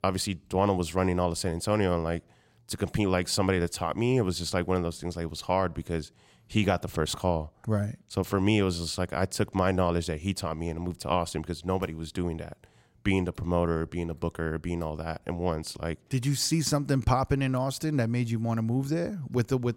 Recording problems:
none

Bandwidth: 16 kHz